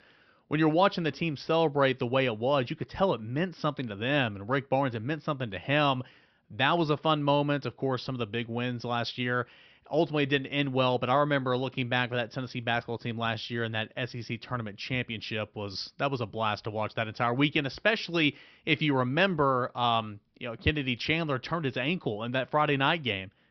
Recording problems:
high frequencies cut off; noticeable; nothing above 5.5 kHz

